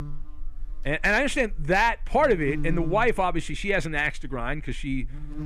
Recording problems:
electrical hum; noticeable; throughout; 50 Hz, 20 dB below the speech

